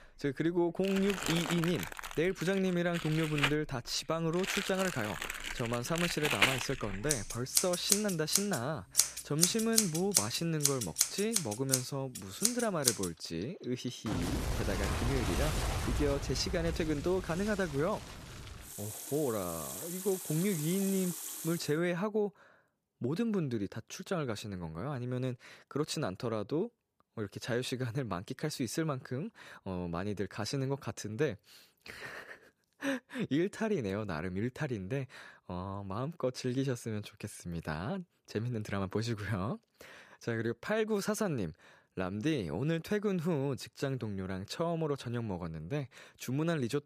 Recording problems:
household noises; very loud; until 22 s; 1 dB above the speech

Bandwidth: 14.5 kHz